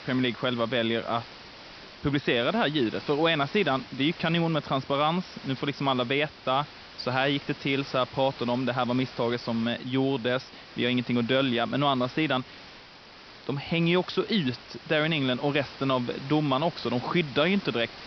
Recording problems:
high frequencies cut off; noticeable; nothing above 5.5 kHz
hiss; noticeable; throughout; 15 dB below the speech

